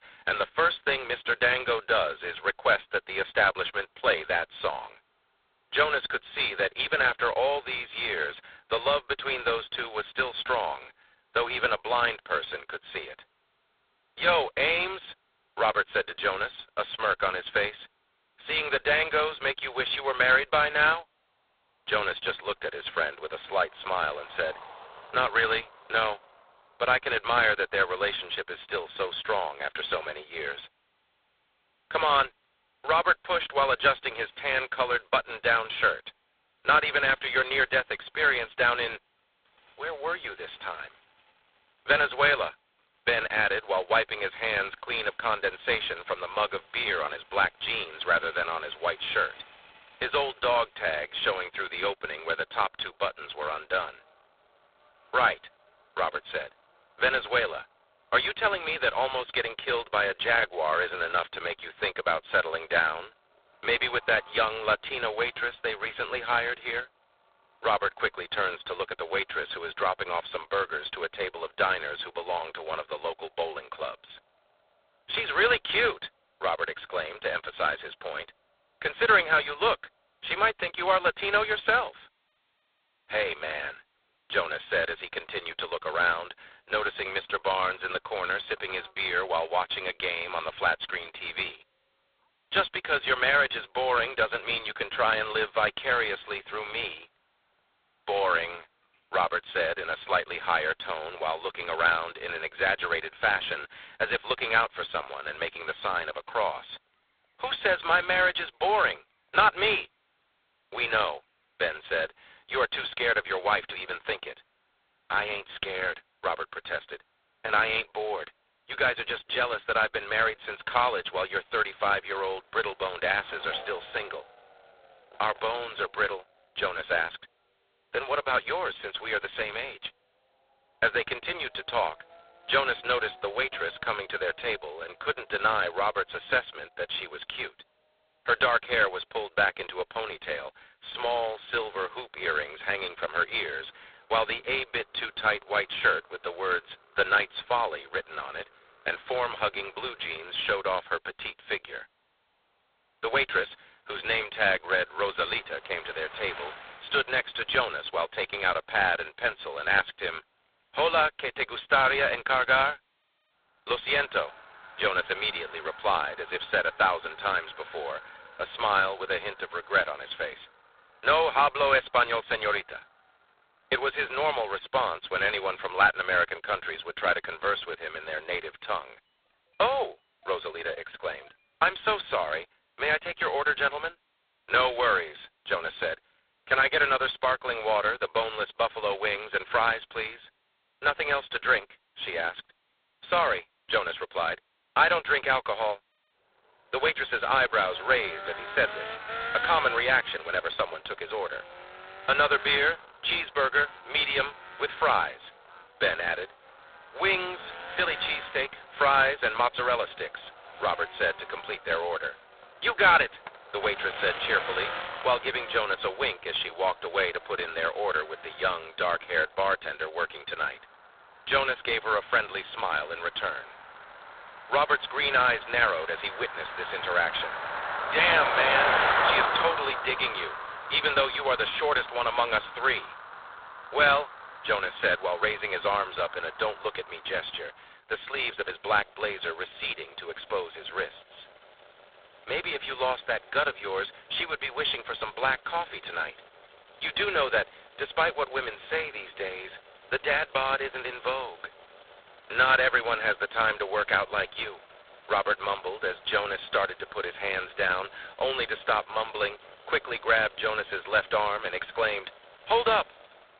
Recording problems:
phone-call audio; poor line; nothing above 4 kHz
thin; very; fading below 550 Hz
traffic noise; noticeable; throughout; 10 dB below the speech

